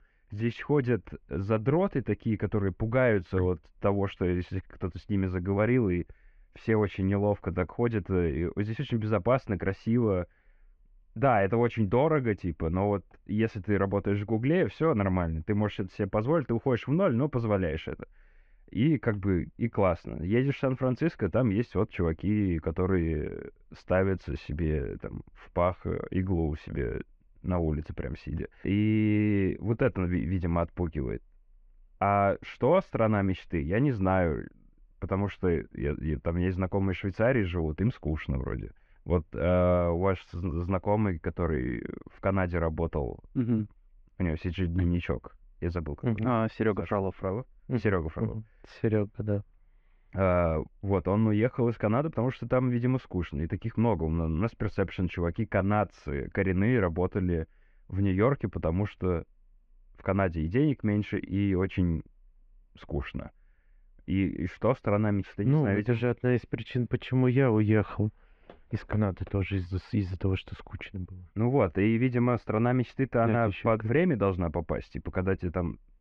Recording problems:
muffled; very; fading above 2.5 kHz

